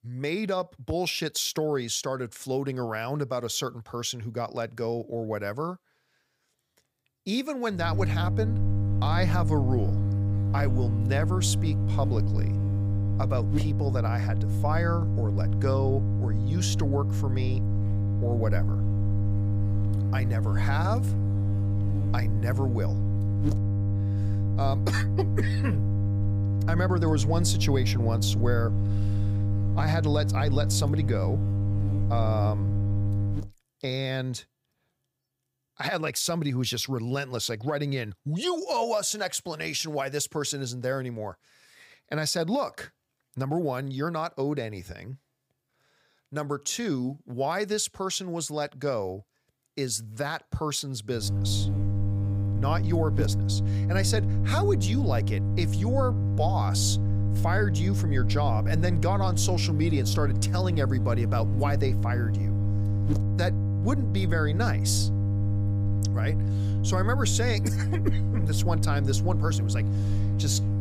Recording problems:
electrical hum; loud; from 8 to 33 s and from 51 s on; 50 Hz, 7 dB below the speech

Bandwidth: 15 kHz